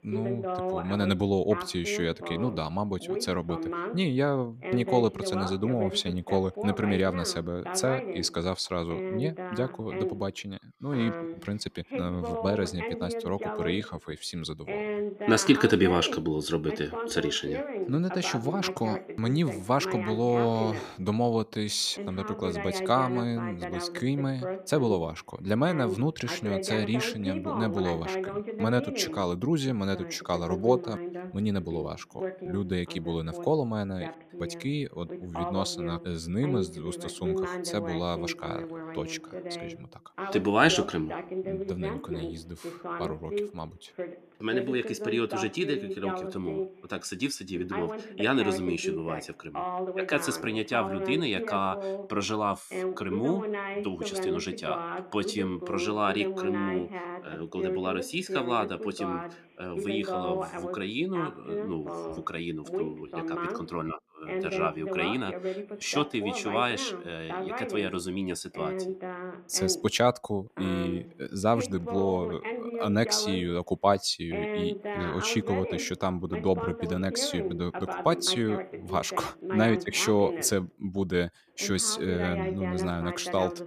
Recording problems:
voice in the background; loud; throughout; 6 dB below the speech

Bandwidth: 14.5 kHz